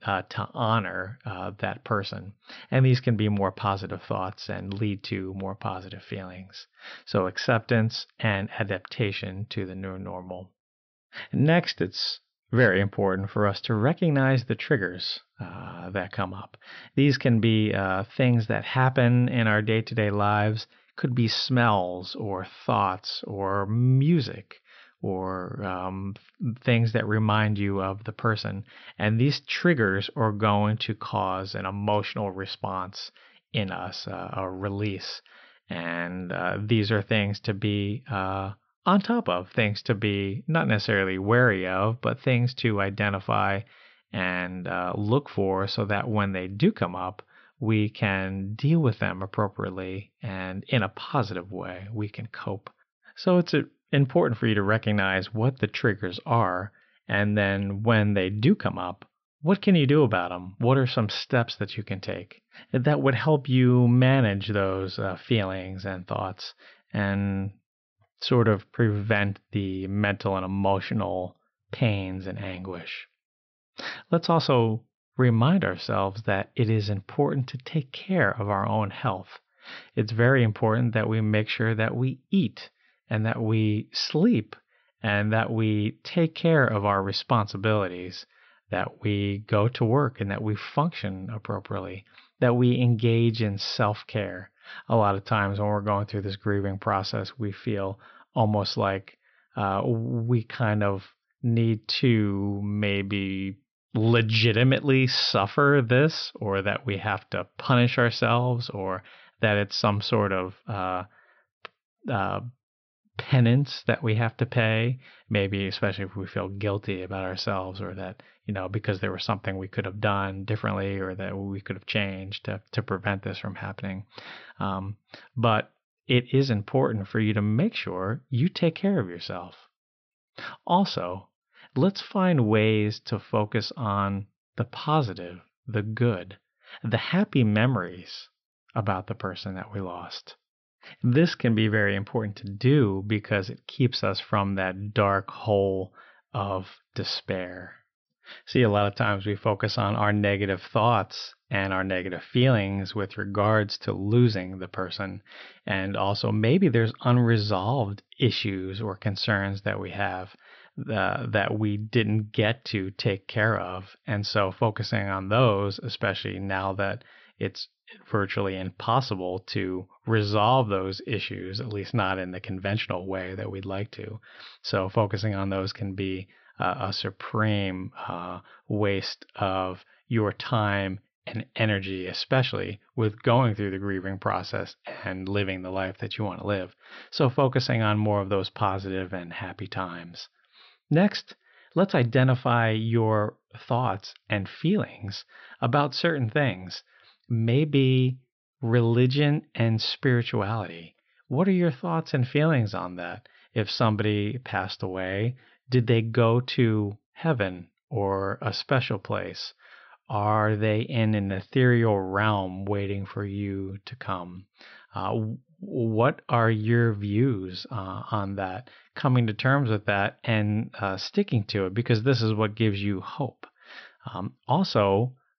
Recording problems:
high frequencies cut off; noticeable; nothing above 5.5 kHz

